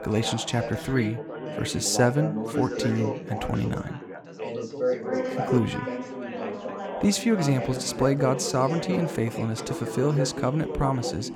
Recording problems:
background chatter; loud; throughout; 4 voices, 5 dB below the speech

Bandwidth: 17.5 kHz